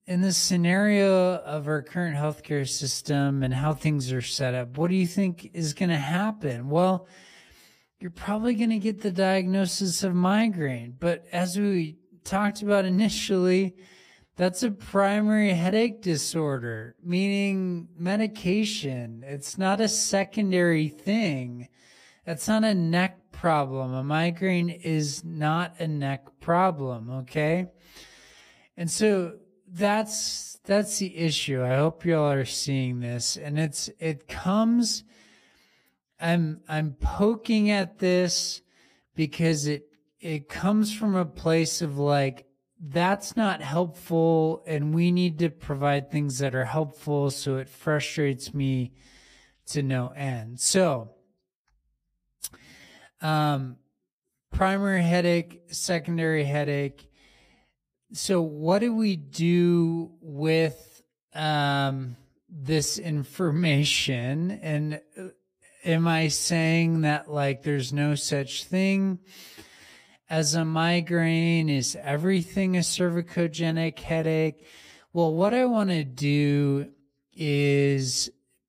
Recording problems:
wrong speed, natural pitch; too slow; 0.7 times normal speed

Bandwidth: 15 kHz